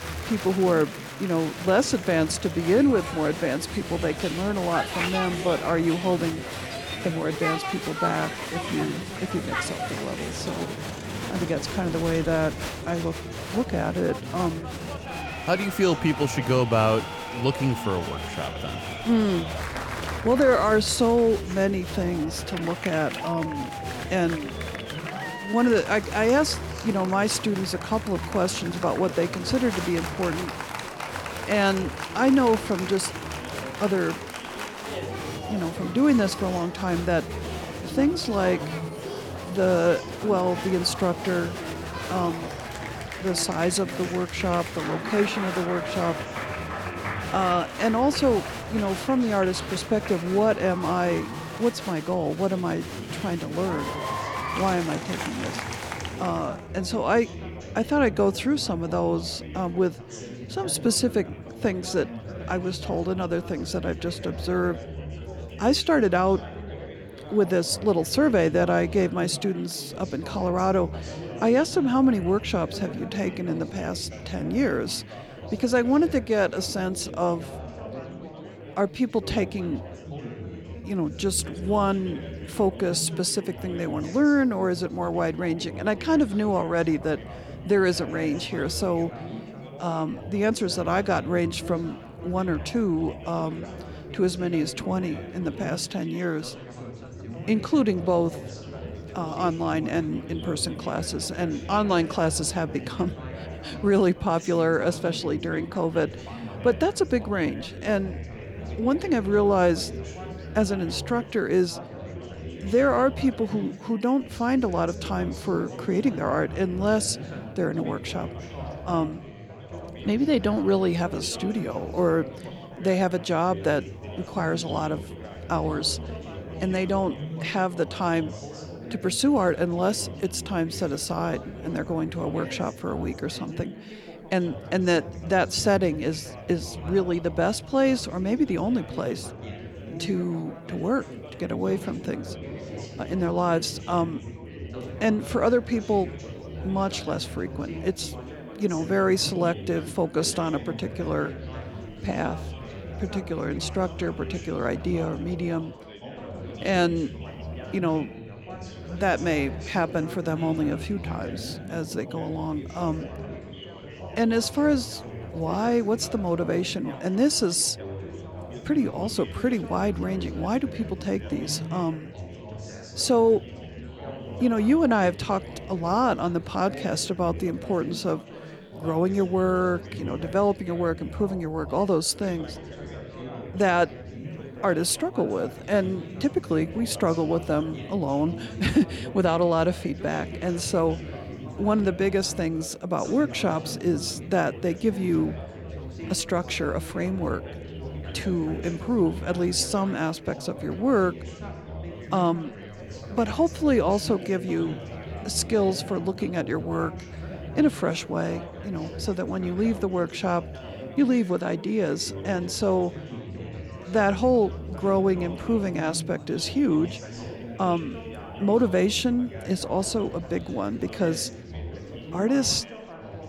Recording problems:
chatter from many people; noticeable; throughout; 10 dB below the speech

